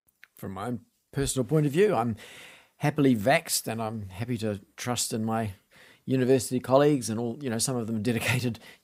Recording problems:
none

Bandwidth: 15.5 kHz